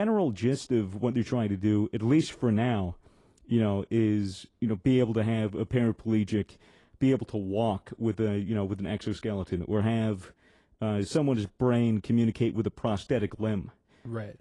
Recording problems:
garbled, watery; slightly; nothing above 10 kHz
abrupt cut into speech; at the start

